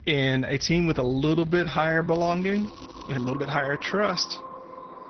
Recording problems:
echo of what is said; noticeable; throughout; 380 ms later, 15 dB below the speech
garbled, watery; slightly; nothing above 6 kHz
background music; faint; throughout; 25 dB below the speech
crackling; faint; from 2 to 3 s; 25 dB below the speech
uneven, jittery; strongly; from 1.5 to 4 s

